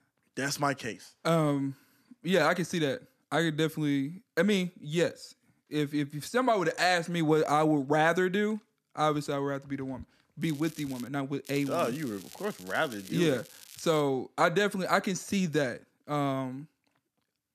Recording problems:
crackling; noticeable; at 10 s and from 11 to 14 s; 20 dB below the speech

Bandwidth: 14.5 kHz